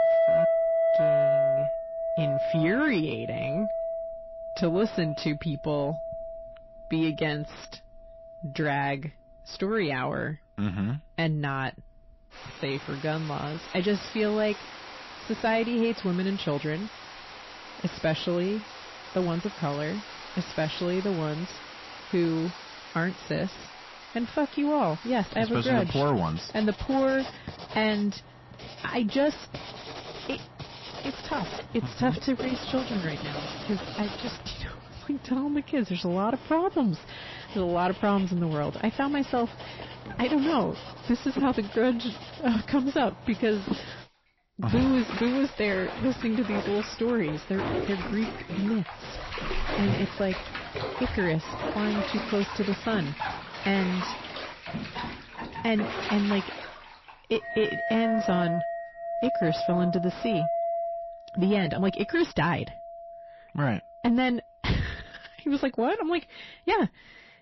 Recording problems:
distortion; slight; 10 dB below the speech
garbled, watery; slightly; nothing above 5.5 kHz
household noises; loud; throughout; 5 dB below the speech
uneven, jittery; strongly; from 12 s to 1:05

